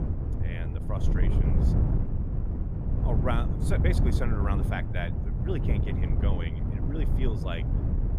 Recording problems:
wind noise on the microphone; heavy; 3 dB below the speech

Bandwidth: 15 kHz